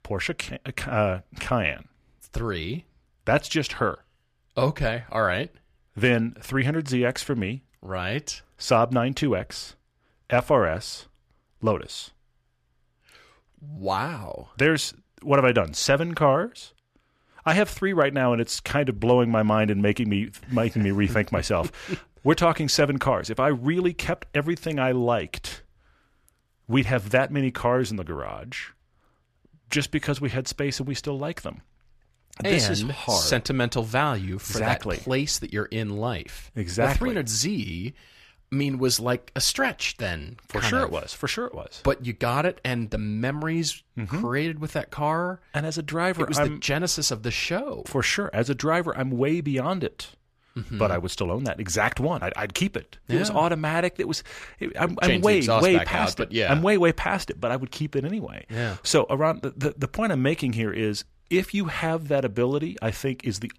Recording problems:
none

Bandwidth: 14.5 kHz